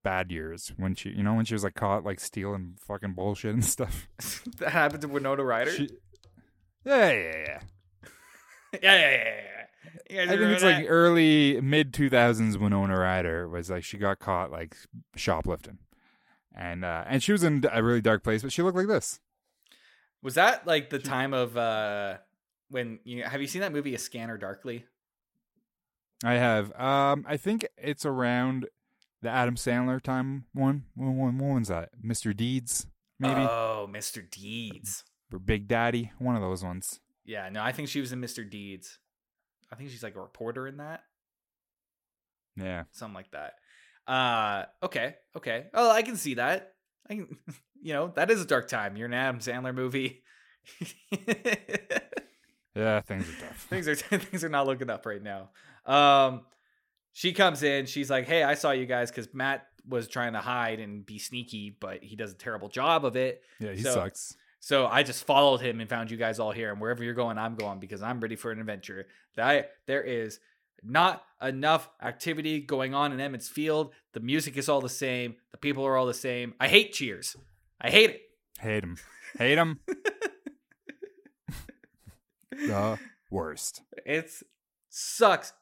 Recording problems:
none

